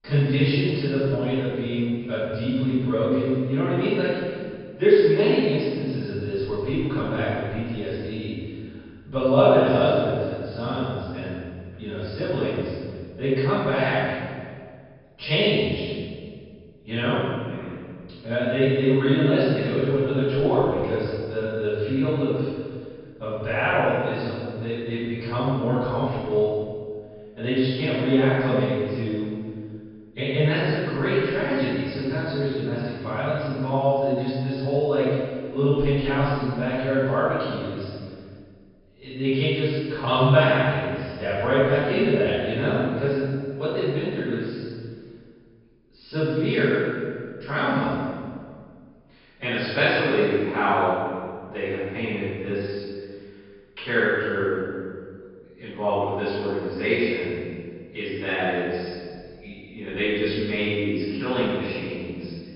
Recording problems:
room echo; strong; dies away in 1.8 s
off-mic speech; far
high frequencies cut off; noticeable; nothing above 5.5 kHz

